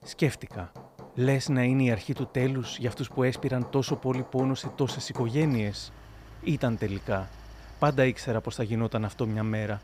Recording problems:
machinery noise; noticeable; throughout; 20 dB below the speech

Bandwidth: 15.5 kHz